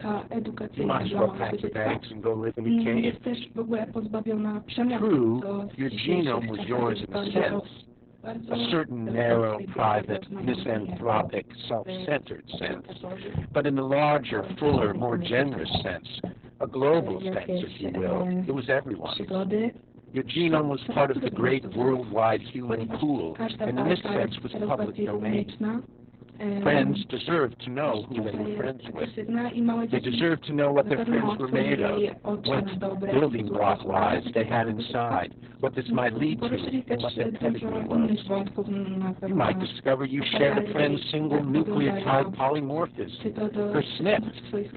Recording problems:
garbled, watery; badly; nothing above 4 kHz
distortion; slight; 10 dB below the speech
voice in the background; loud; throughout; 4 dB below the speech
electrical hum; faint; throughout; 60 Hz, 25 dB below the speech

